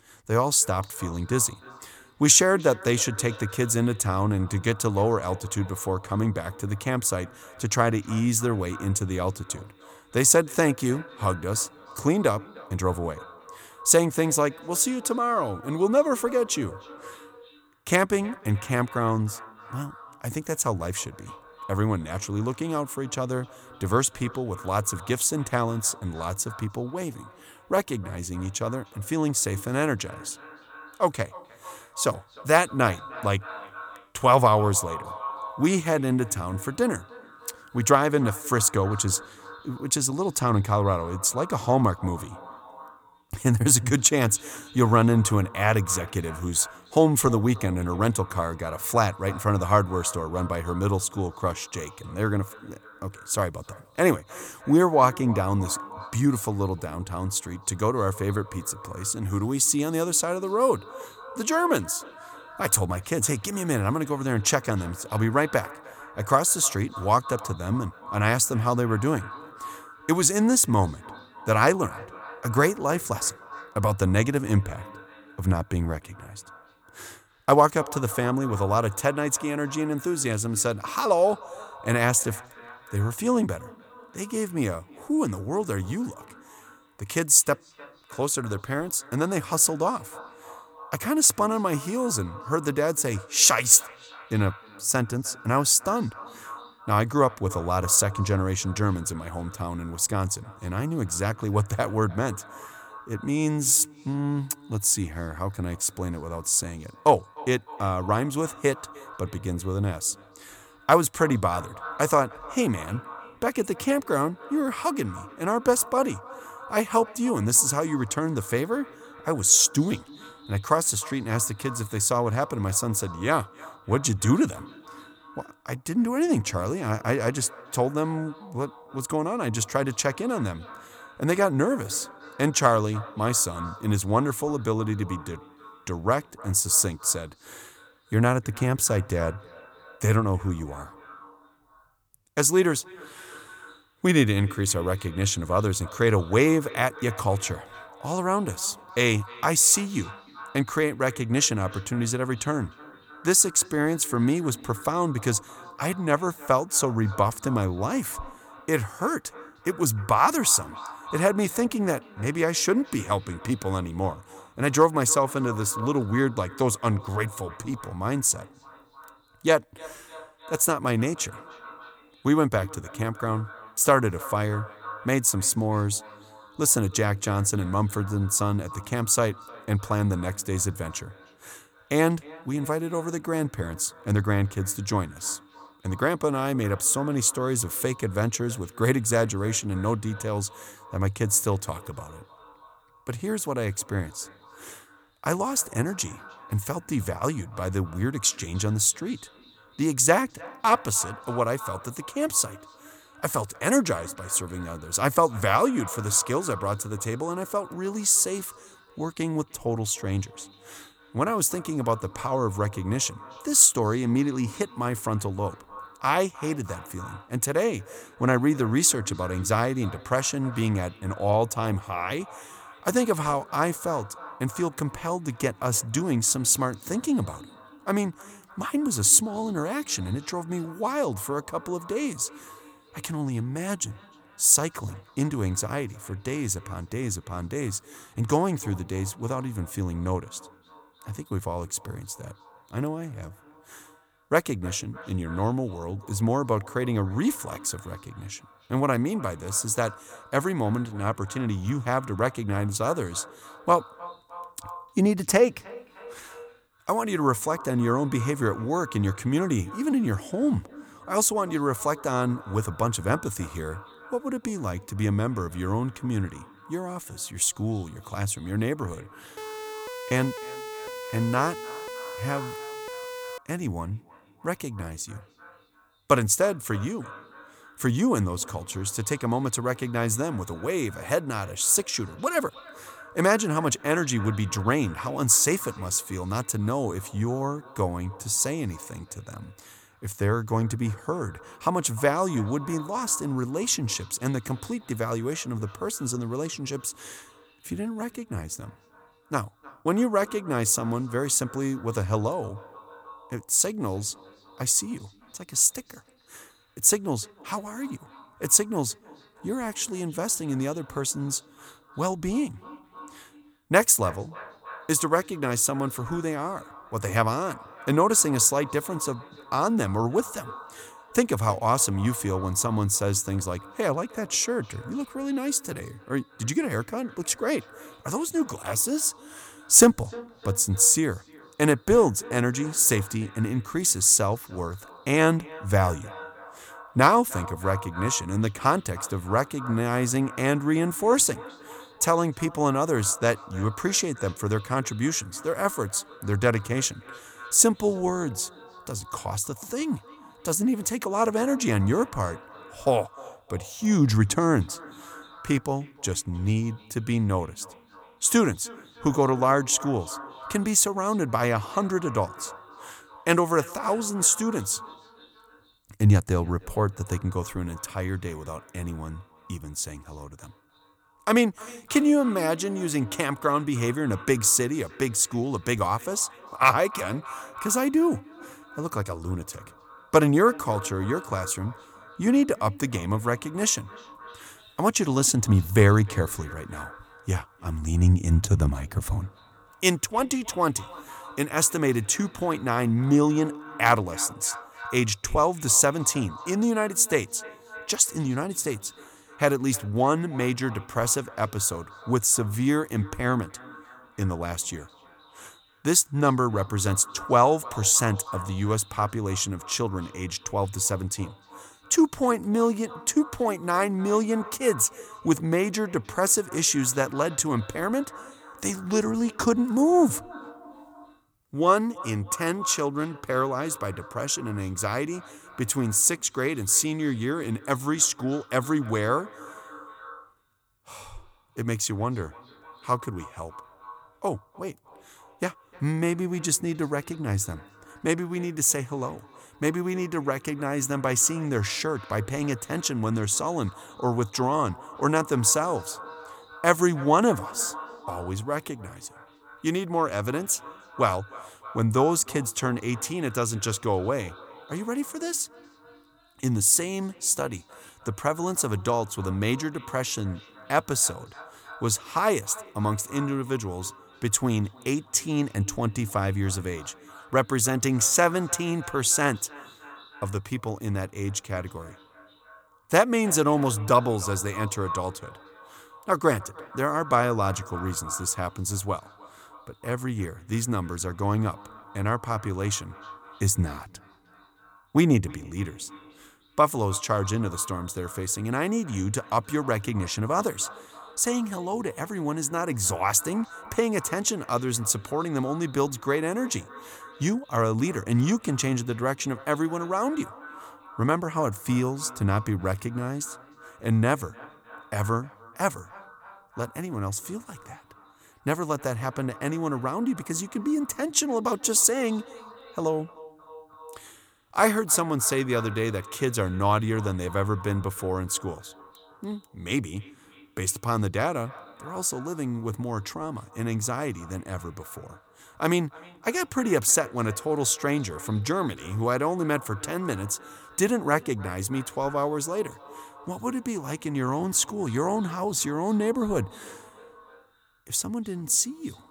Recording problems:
echo of what is said; faint; throughout; 300 ms later, 20 dB below the speech
uneven, jittery; strongly; from 13 s to 6:52
siren; faint; from 4:29 to 4:33; peak 10 dB below the speech

